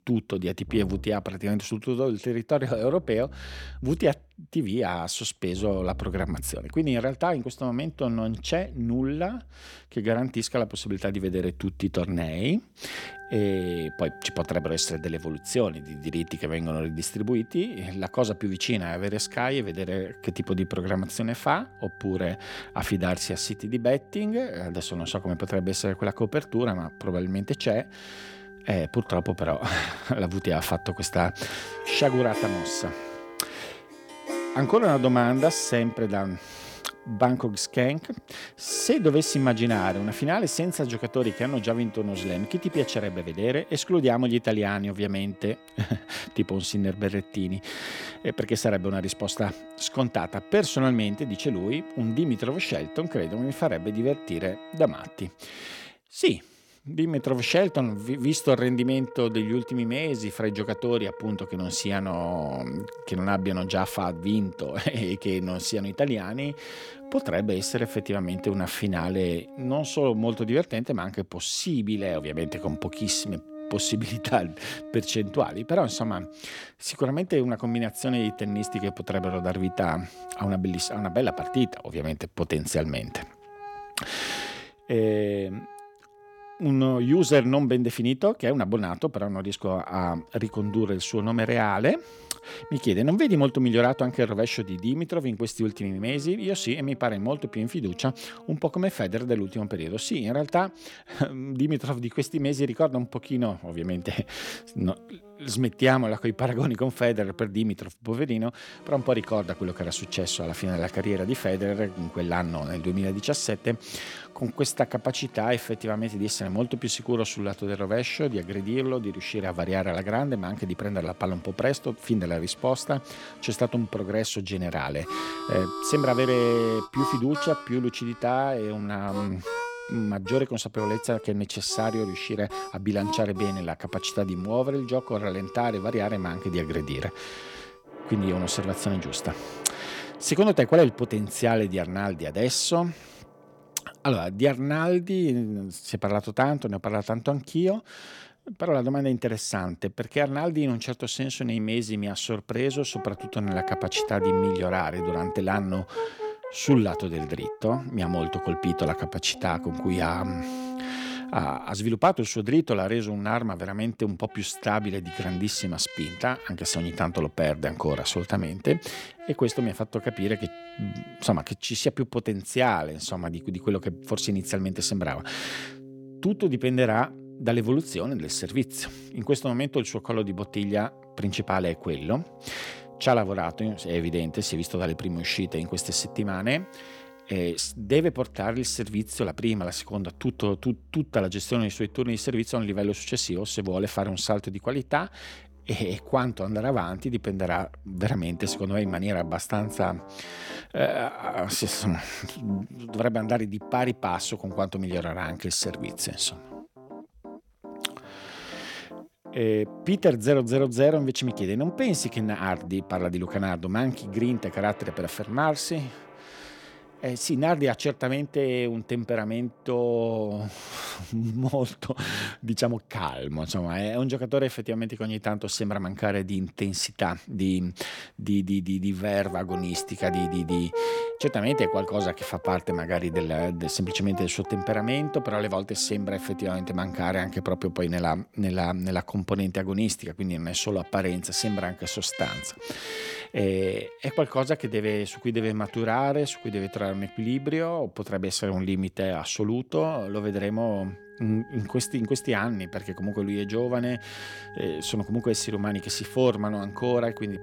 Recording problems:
background music; noticeable; throughout; 15 dB below the speech

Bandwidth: 17 kHz